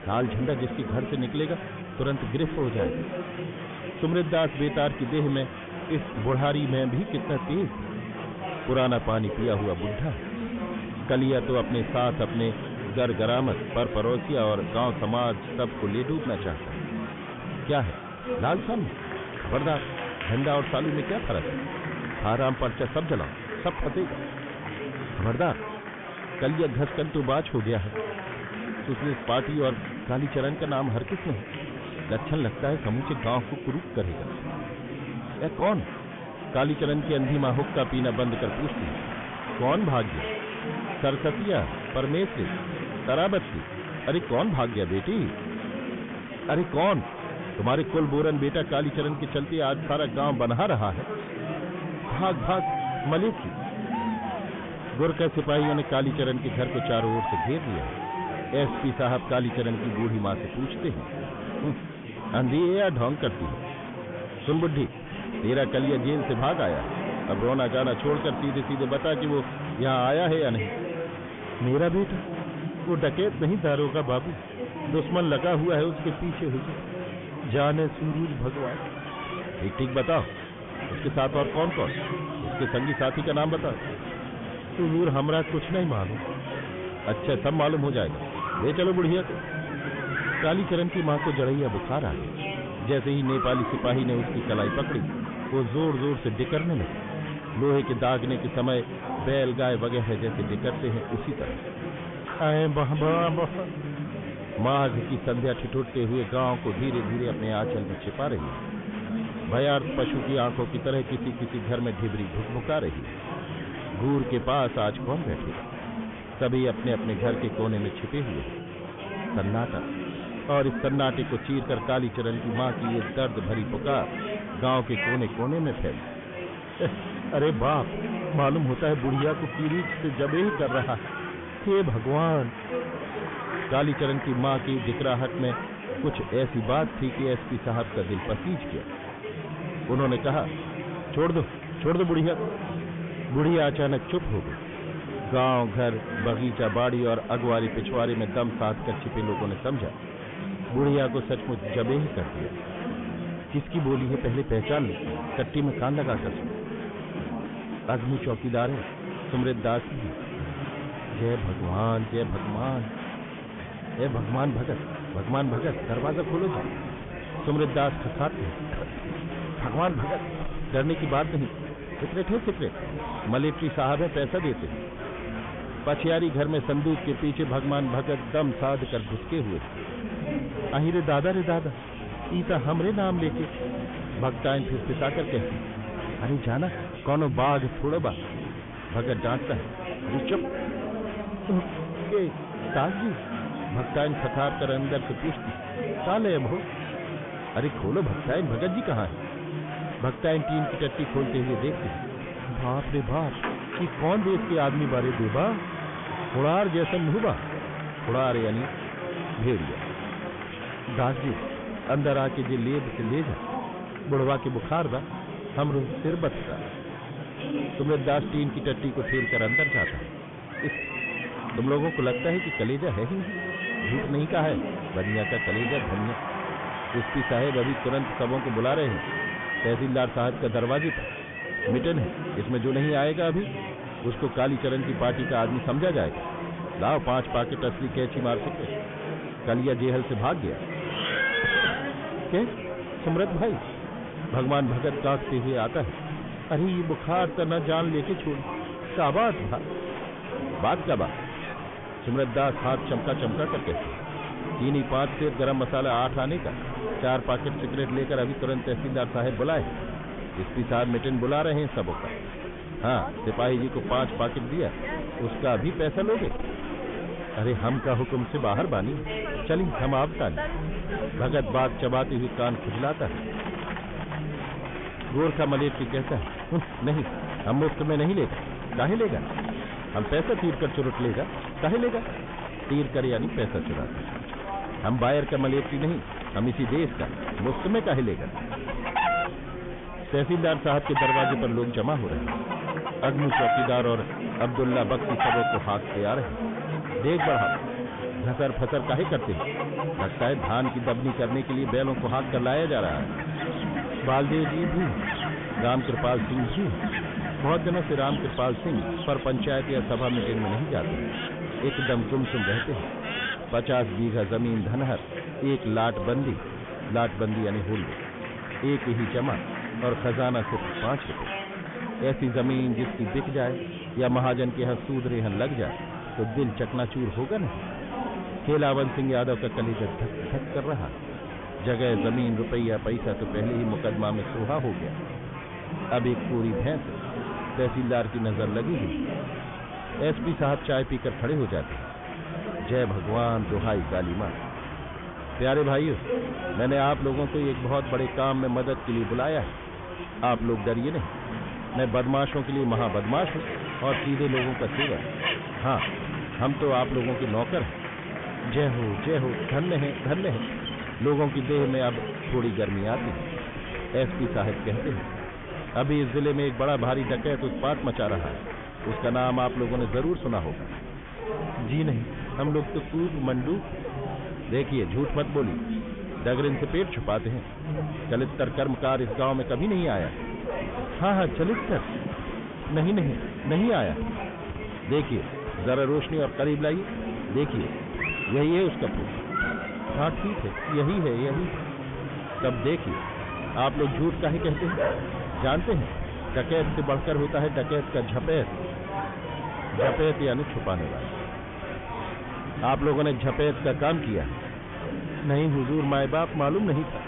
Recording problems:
high frequencies cut off; severe; nothing above 3.5 kHz
distortion; slight; 10 dB below the speech
animal sounds; loud; throughout; 9 dB below the speech
murmuring crowd; loud; throughout; 7 dB below the speech

